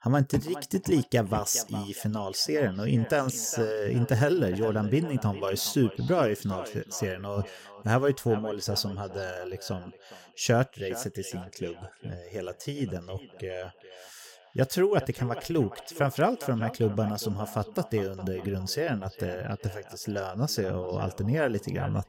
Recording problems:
echo of what is said; noticeable; throughout; 410 ms later, 15 dB below the speech

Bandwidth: 16.5 kHz